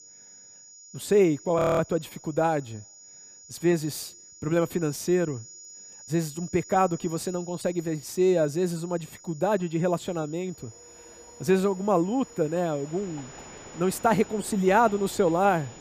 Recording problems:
high-pitched whine; noticeable; throughout; 7 kHz, 20 dB below the speech
train or aircraft noise; faint; from 11 s on; 20 dB below the speech
audio freezing; at 1.5 s

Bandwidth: 15 kHz